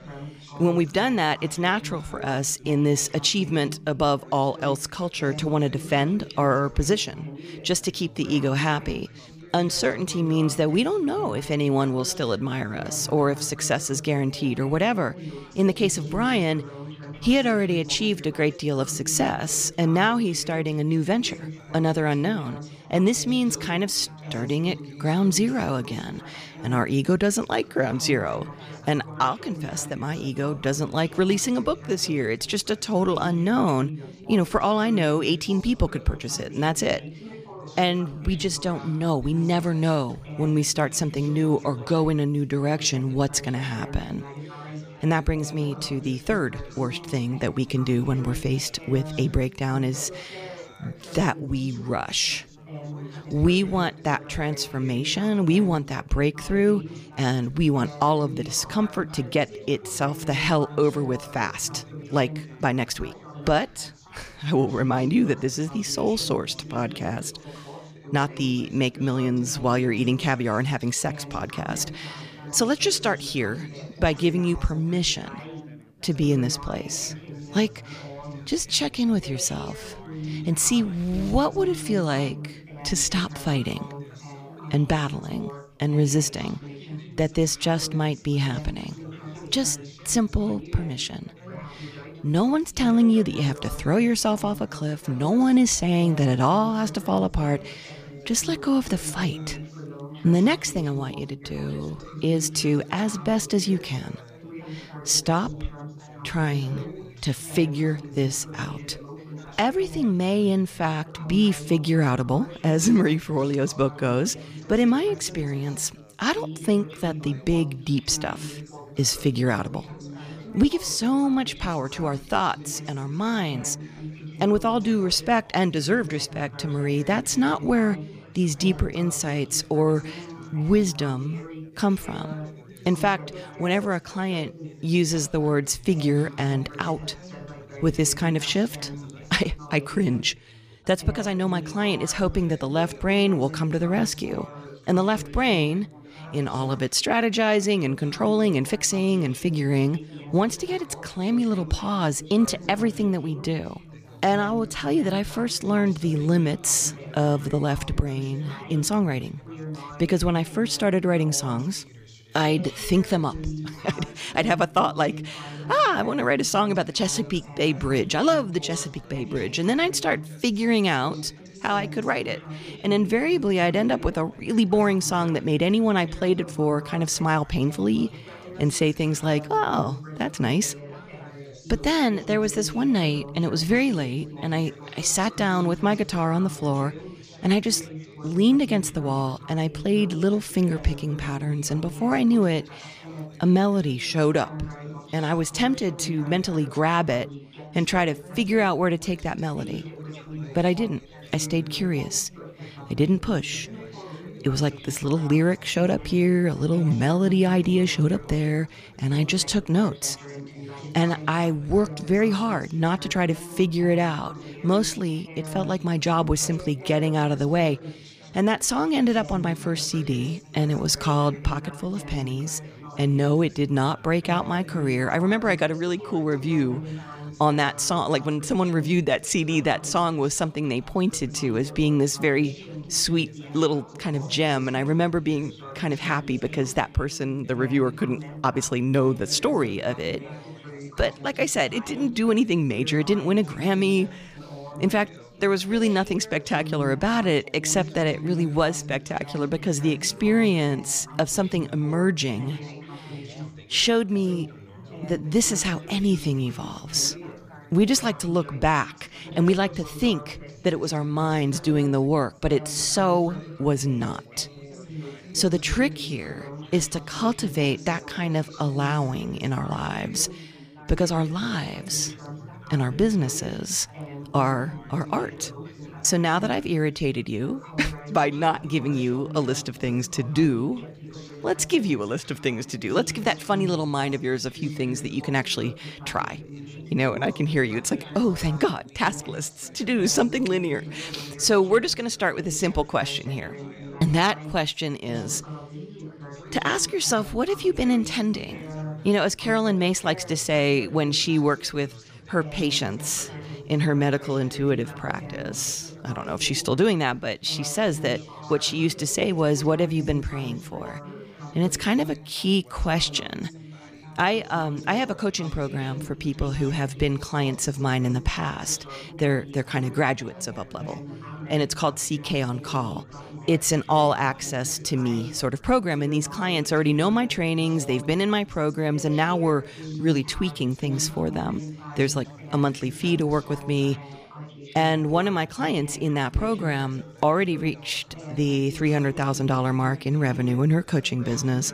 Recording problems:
background chatter; noticeable; throughout; 4 voices, 15 dB below the speech

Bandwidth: 15 kHz